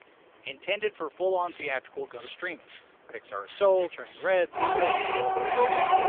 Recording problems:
phone-call audio; poor line; nothing above 3.5 kHz
household noises; very loud; throughout; 4 dB above the speech

